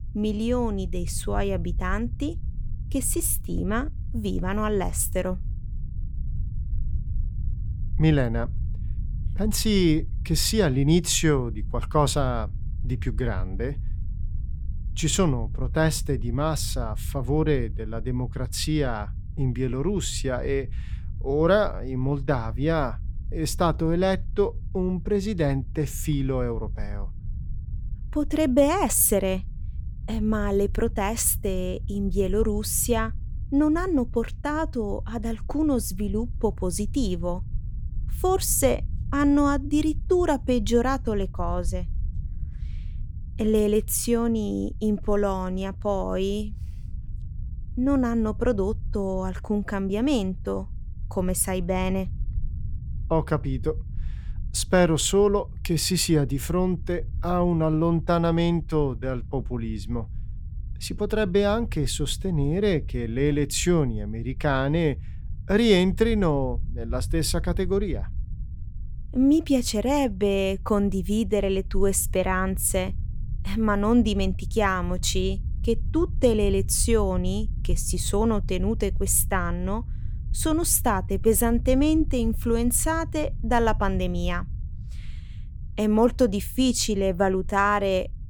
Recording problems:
low rumble; faint; throughout; 25 dB below the speech

